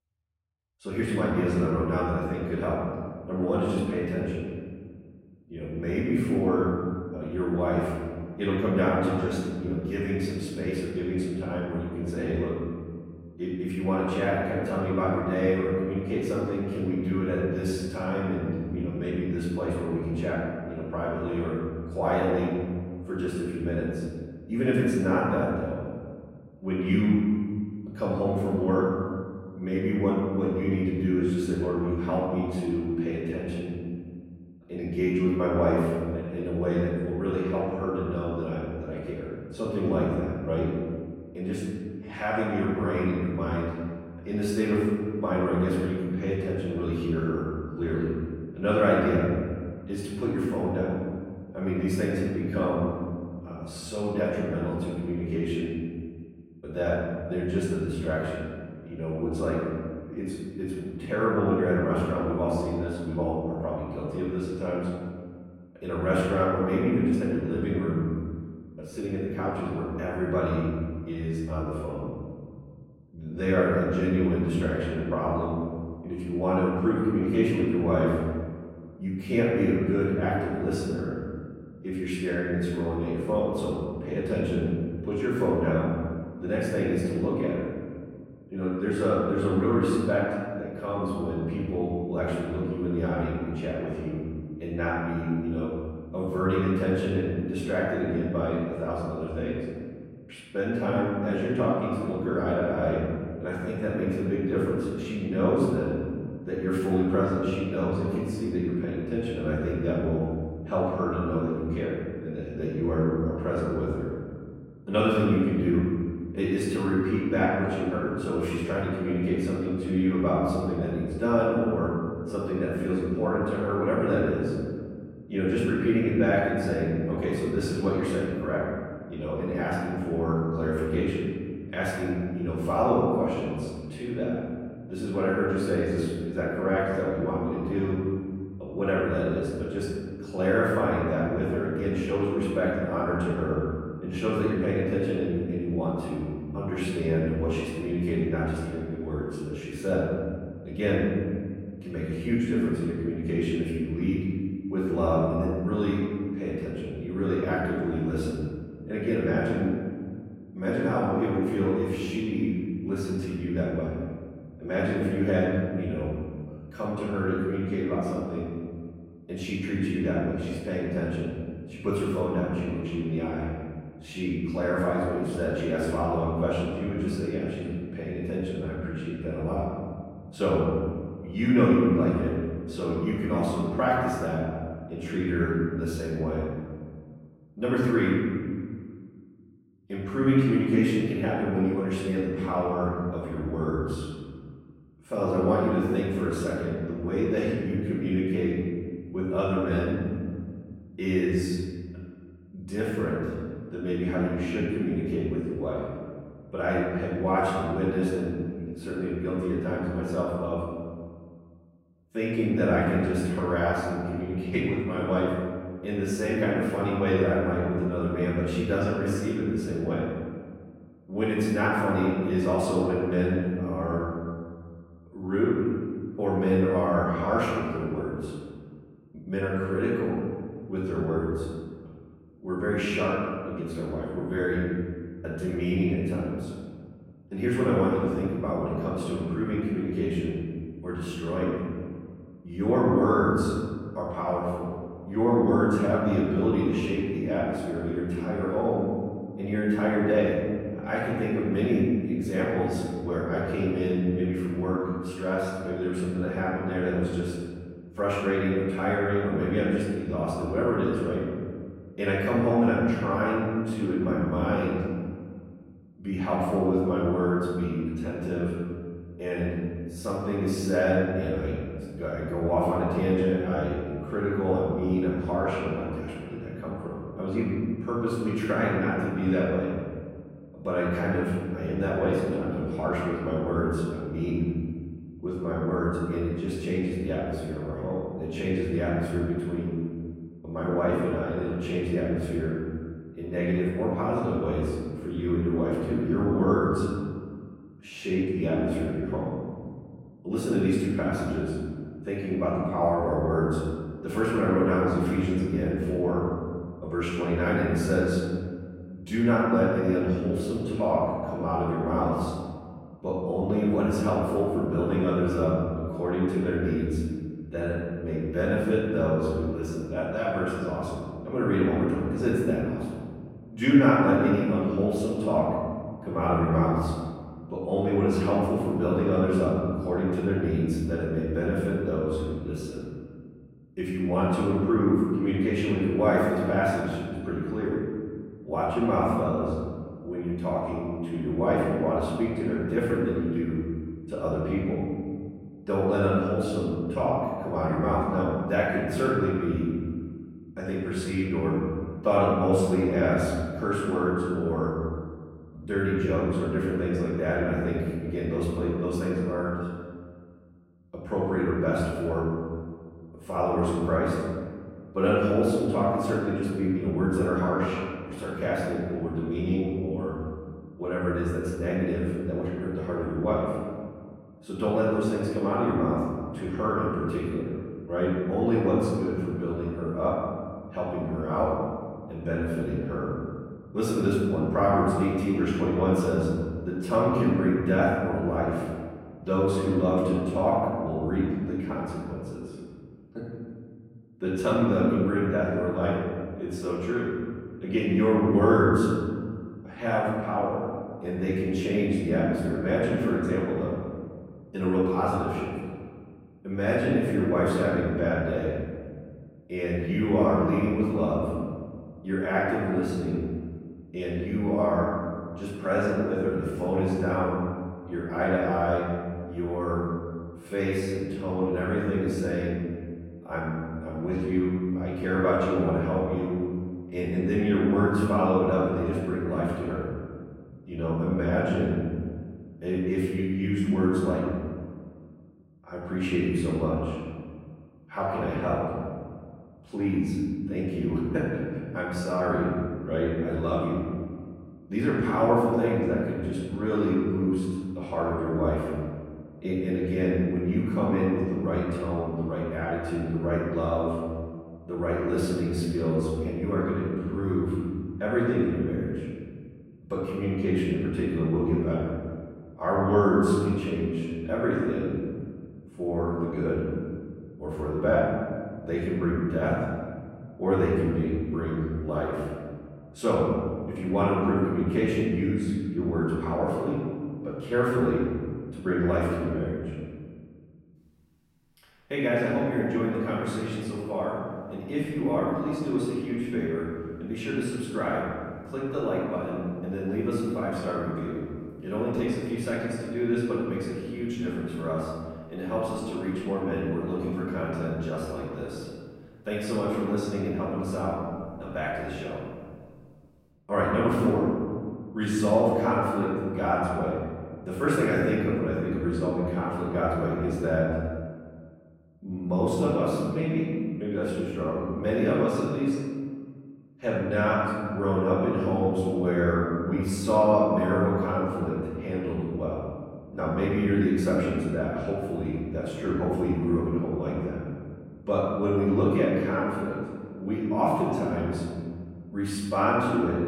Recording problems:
room echo; strong; dies away in 1.8 s
off-mic speech; far

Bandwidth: 16.5 kHz